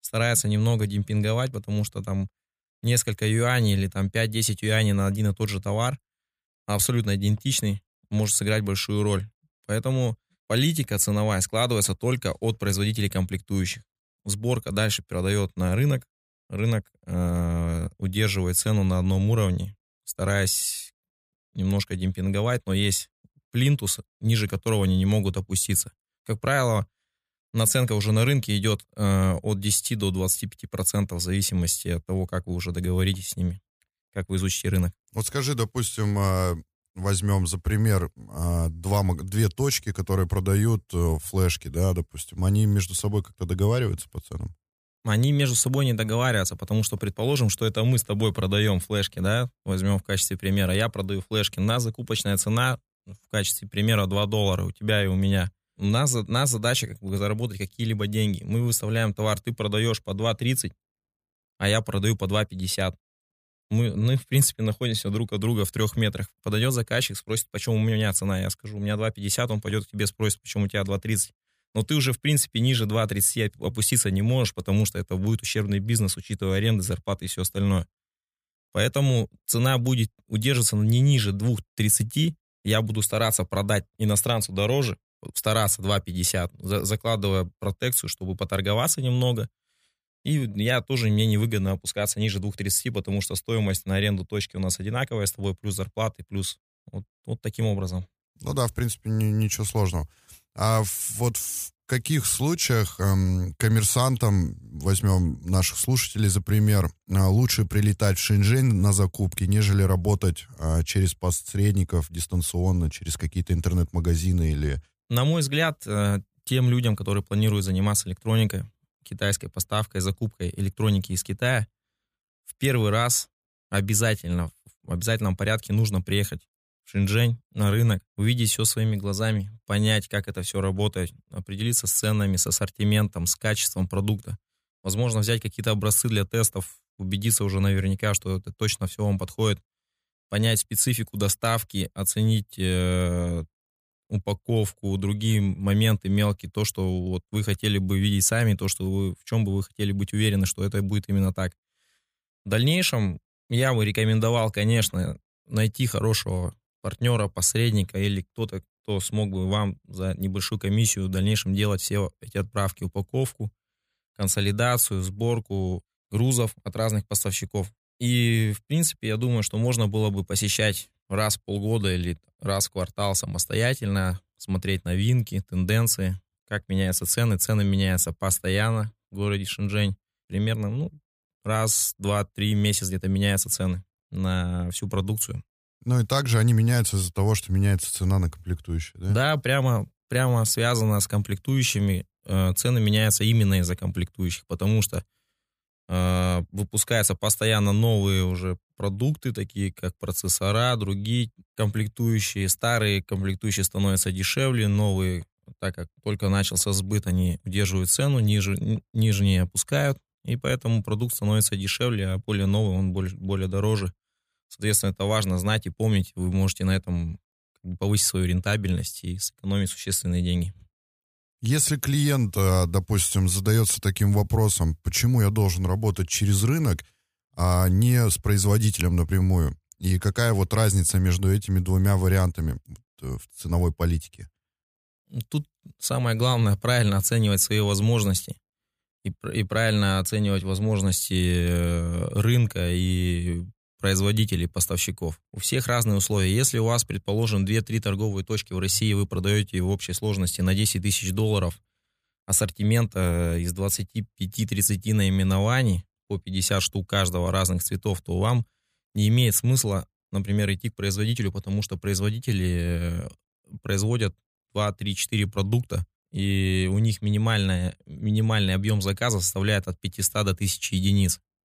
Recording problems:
none

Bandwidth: 15 kHz